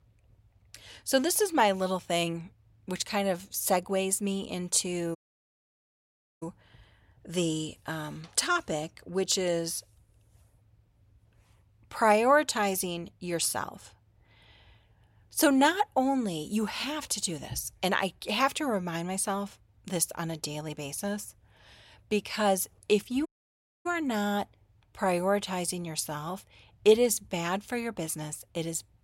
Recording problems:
audio cutting out; at 5 s for 1.5 s and at 23 s for 0.5 s

